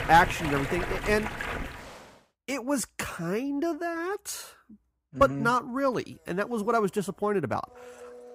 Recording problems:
rain or running water; loud; until 1.5 s; 5 dB below the speech
household noises; faint; from 6.5 s on; 25 dB below the speech

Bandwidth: 15.5 kHz